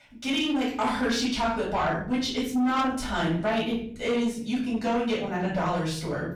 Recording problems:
off-mic speech; far
room echo; noticeable; dies away in 0.7 s
distortion; slight; 10 dB below the speech

